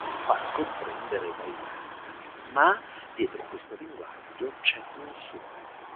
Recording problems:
phone-call audio
traffic noise; noticeable; throughout; 10 dB below the speech

